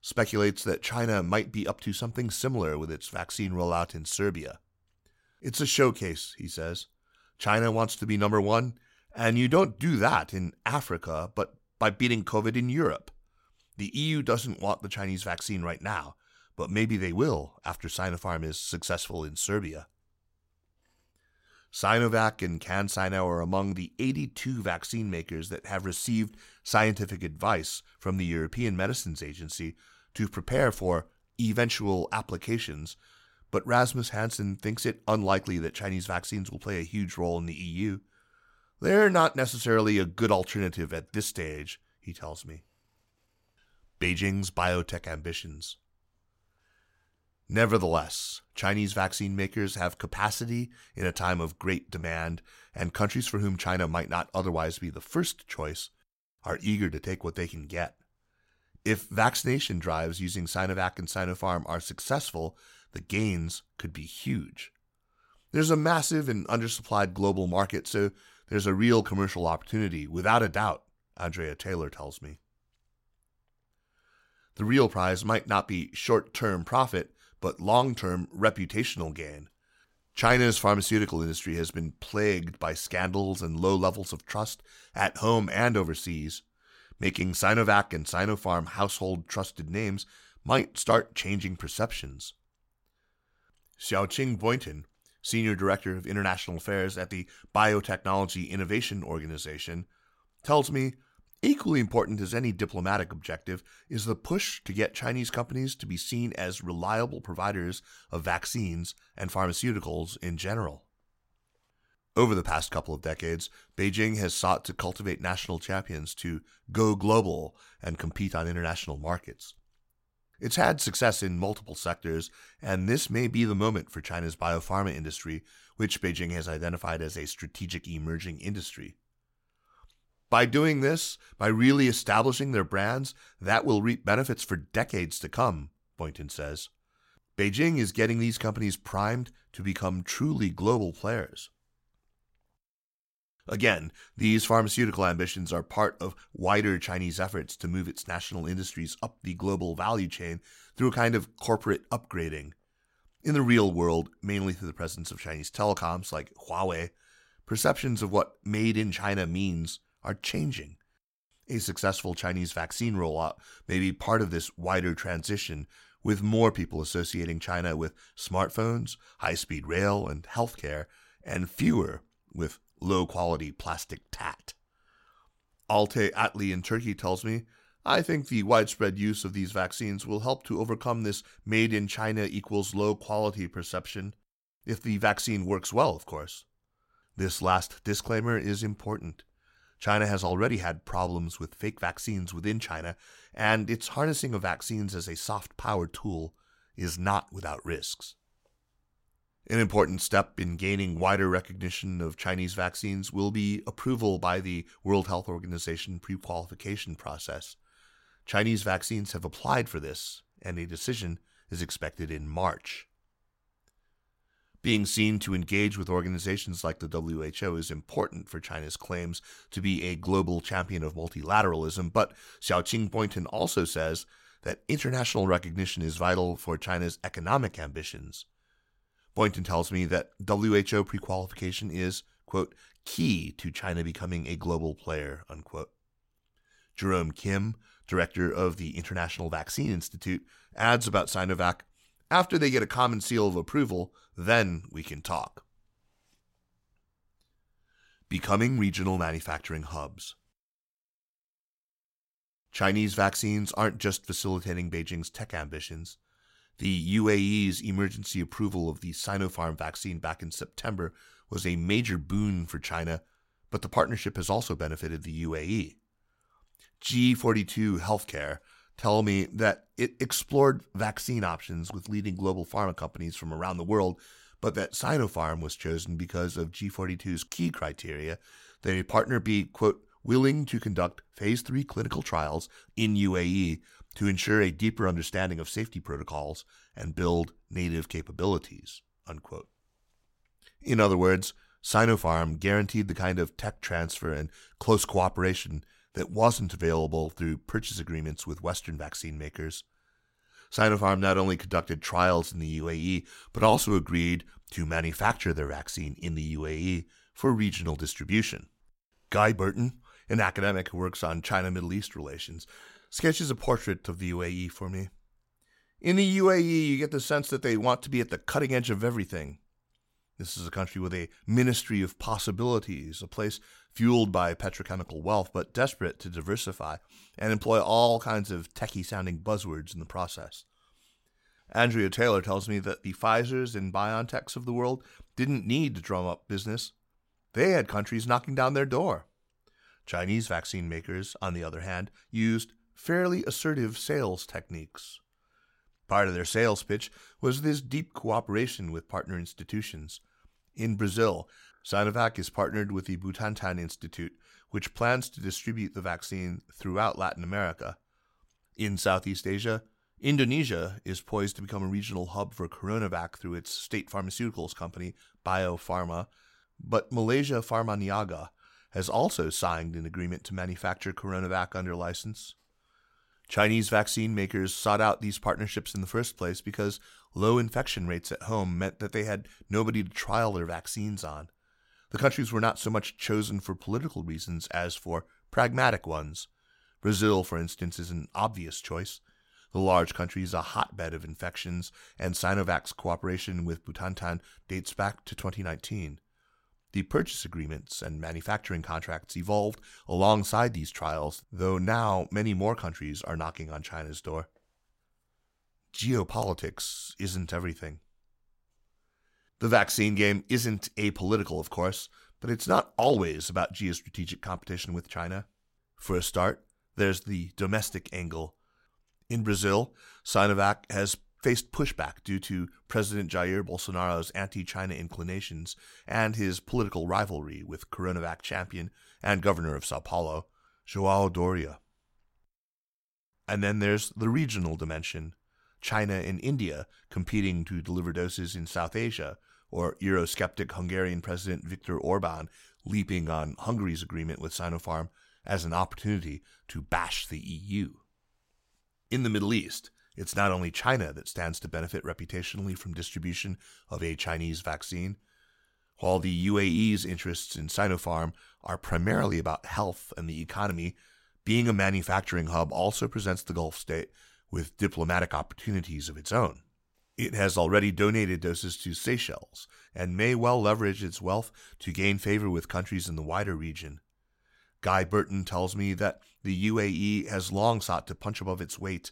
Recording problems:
none

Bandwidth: 16 kHz